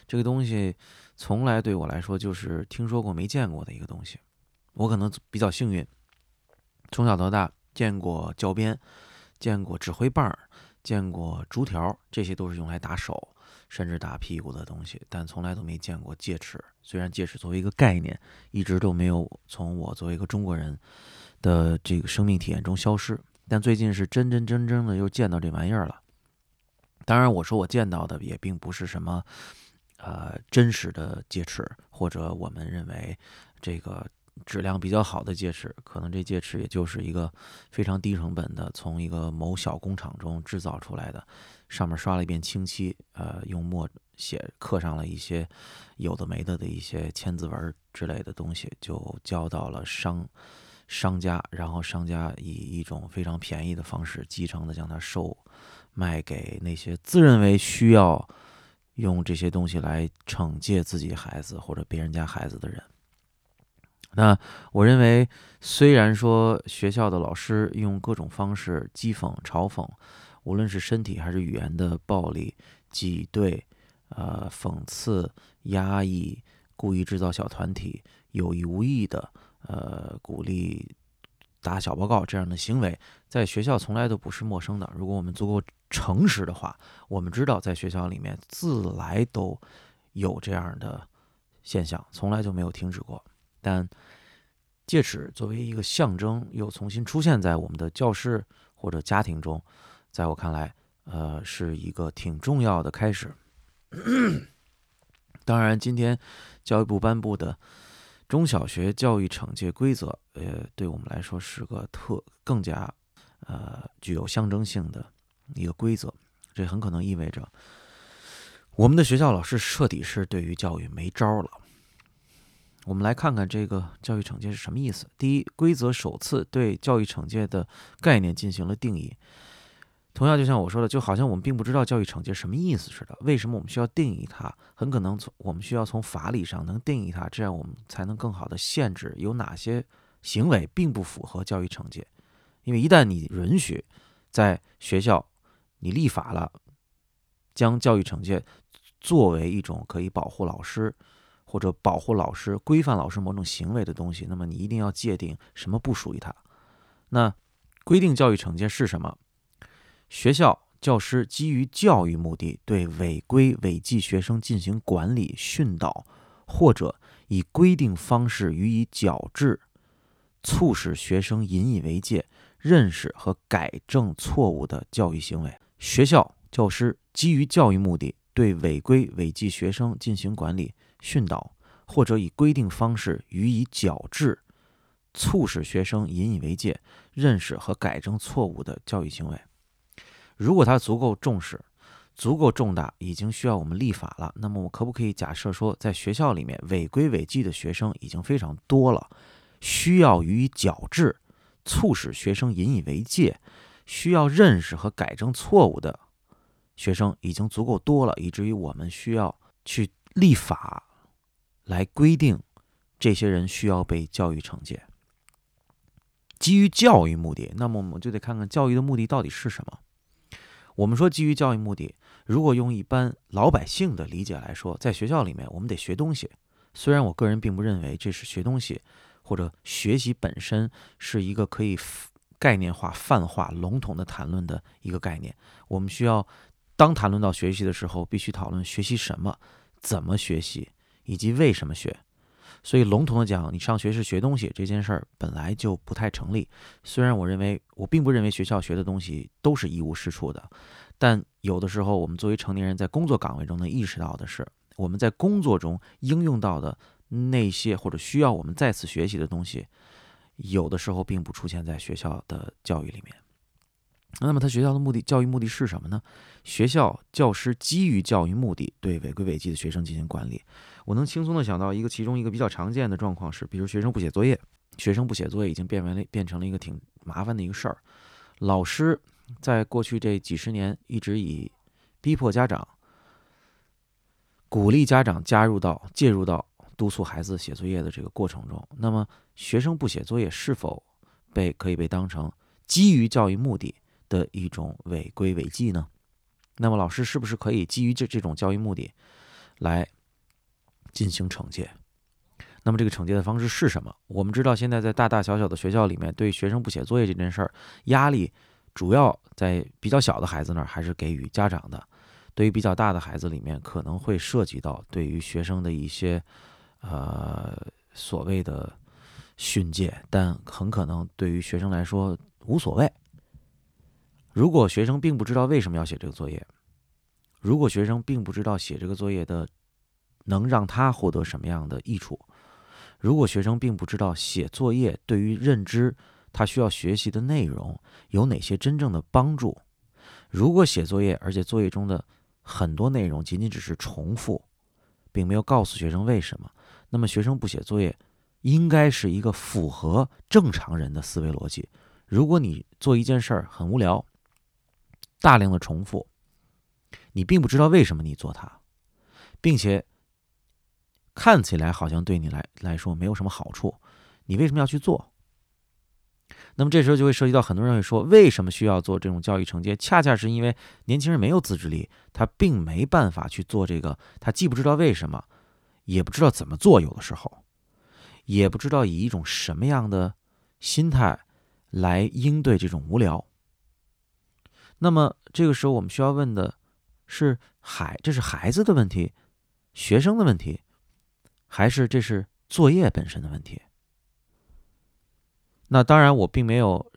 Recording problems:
none

